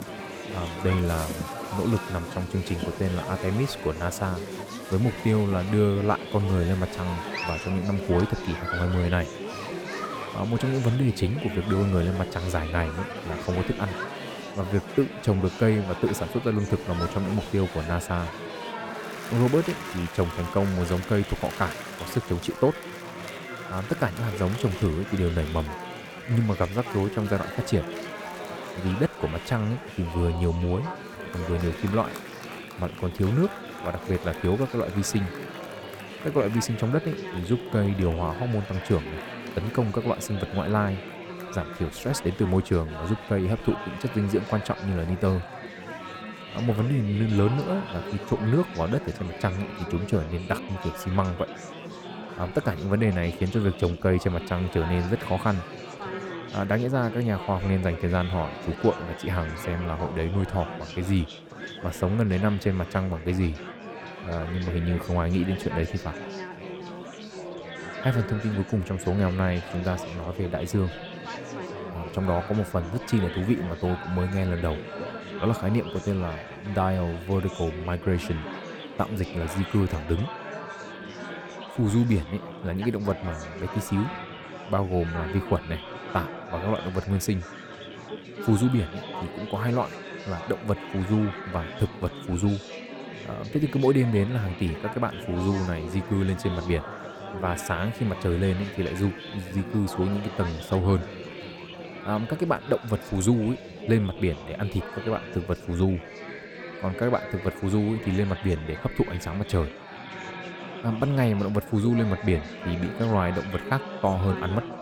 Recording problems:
murmuring crowd; loud; throughout; 9 dB below the speech

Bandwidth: 18.5 kHz